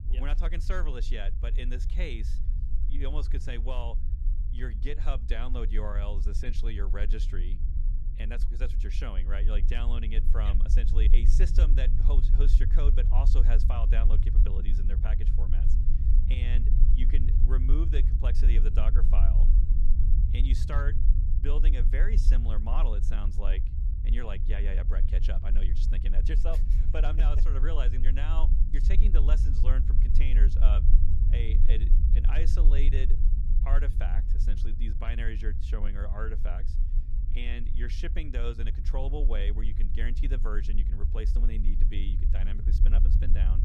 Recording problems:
low rumble; loud; throughout; 7 dB below the speech

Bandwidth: 15 kHz